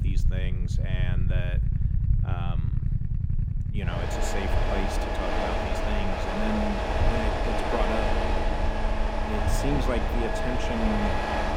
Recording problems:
traffic noise; very loud; throughout; 4 dB above the speech
low rumble; noticeable; throughout; 15 dB below the speech

